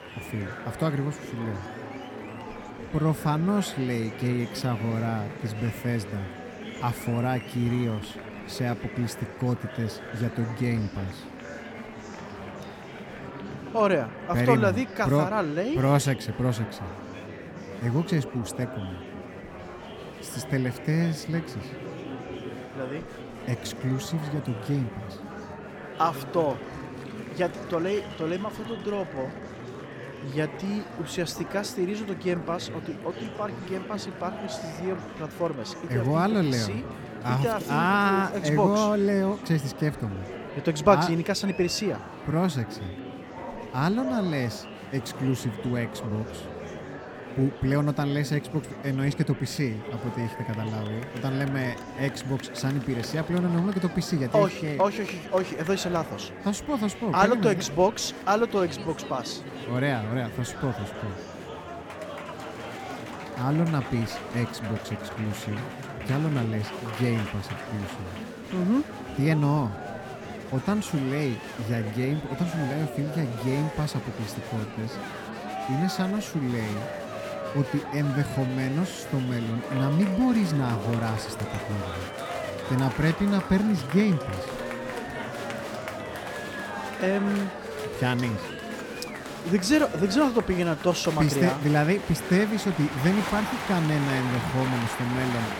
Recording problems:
murmuring crowd; loud; throughout; 9 dB below the speech

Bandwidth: 17.5 kHz